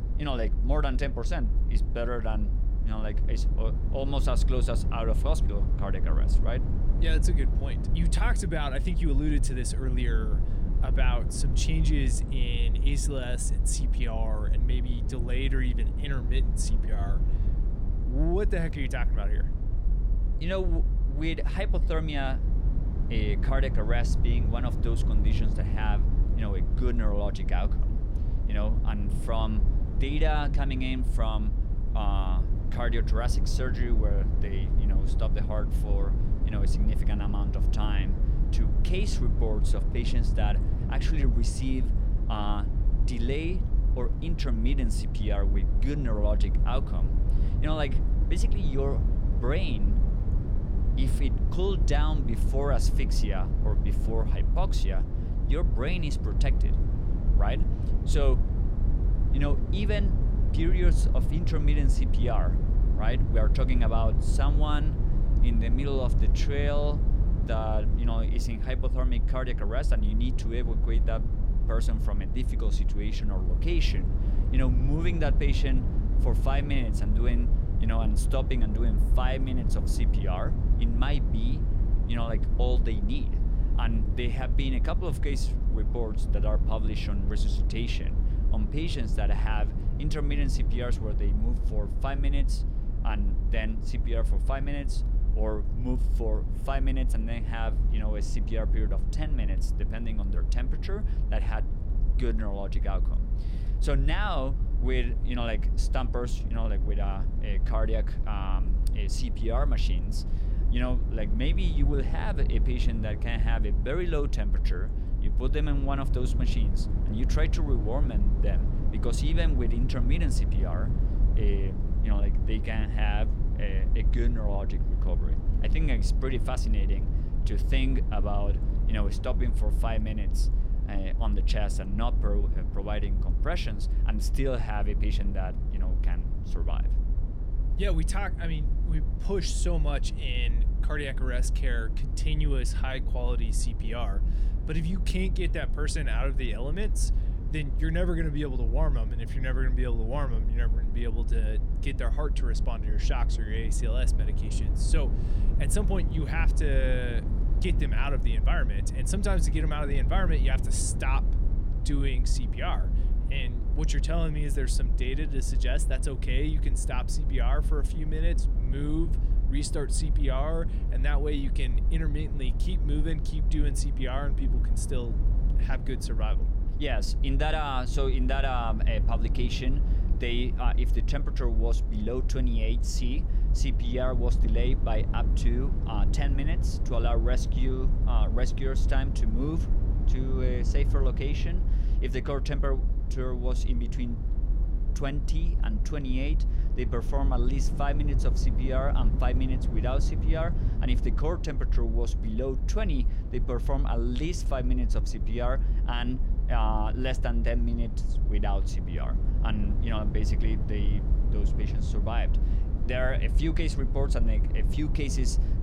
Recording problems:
low rumble; loud; throughout; 9 dB below the speech

